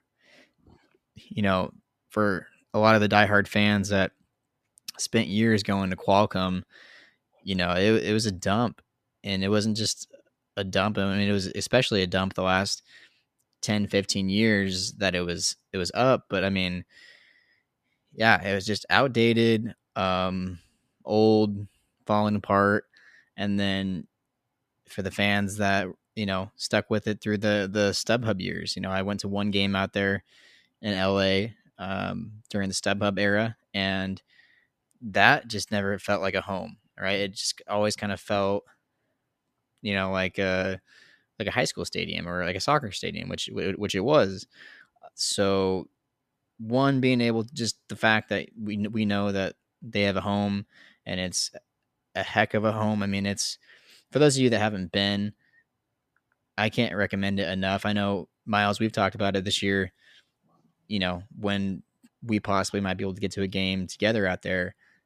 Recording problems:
none

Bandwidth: 14.5 kHz